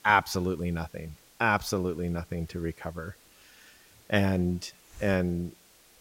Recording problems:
hiss; faint; throughout; 25 dB below the speech

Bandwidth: 16 kHz